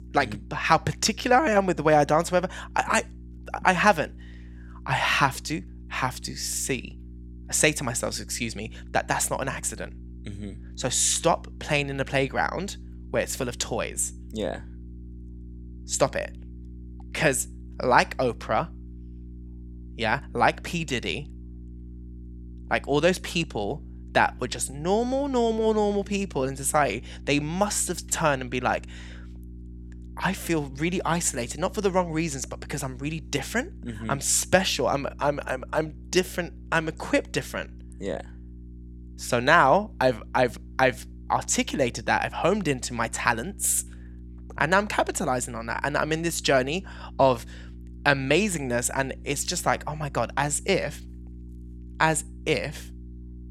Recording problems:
electrical hum; faint; throughout; 60 Hz, 30 dB below the speech

